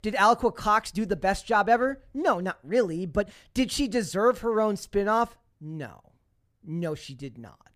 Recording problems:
uneven, jittery; slightly; from 1 to 7 s

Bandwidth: 15 kHz